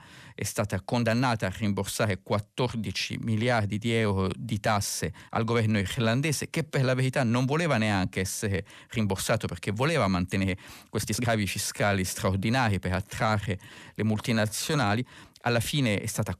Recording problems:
uneven, jittery; strongly; from 1 to 16 s

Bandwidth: 14.5 kHz